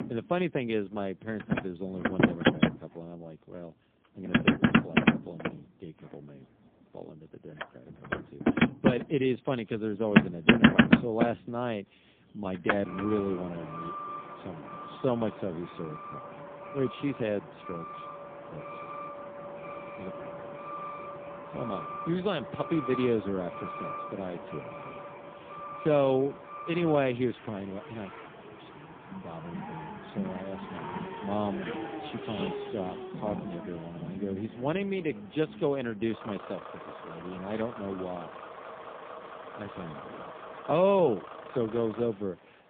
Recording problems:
phone-call audio; poor line
traffic noise; very loud; throughout; as loud as the speech

